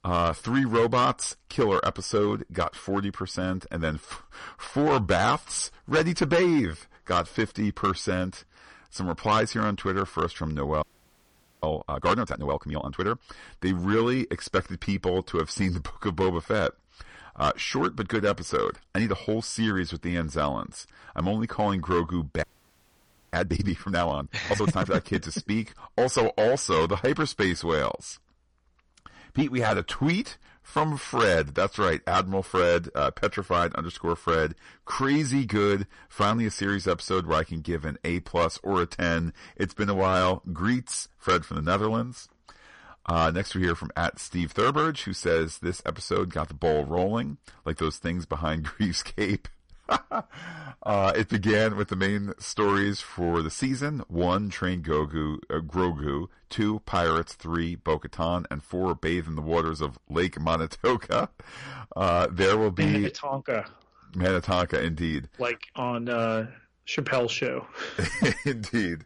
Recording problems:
distortion; slight; 4% of the sound clipped
garbled, watery; slightly; nothing above 9.5 kHz
audio freezing; at 11 s for 1 s and at 22 s for 1 s

